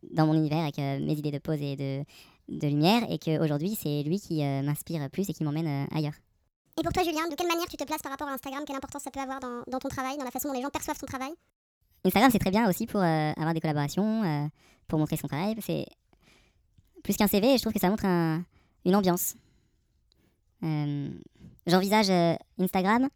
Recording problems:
wrong speed and pitch; too fast and too high; 1.5 times normal speed

